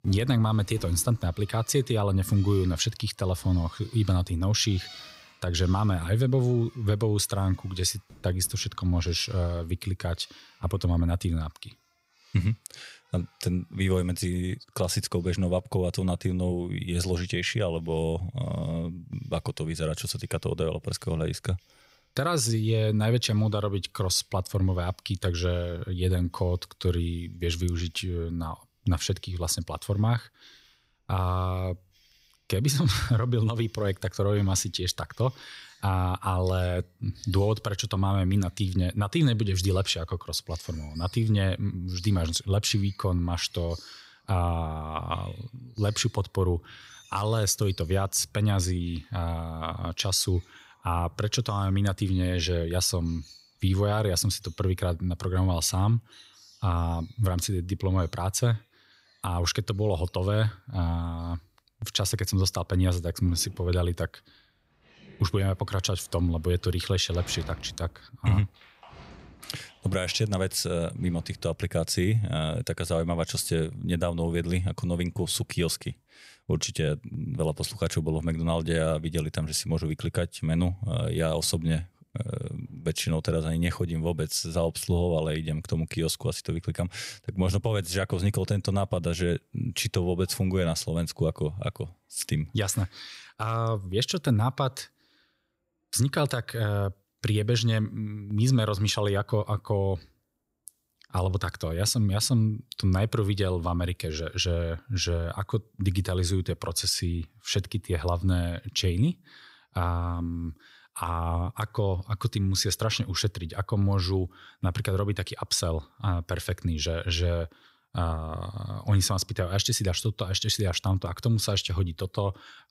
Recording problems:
animal sounds; faint; throughout; 25 dB below the speech

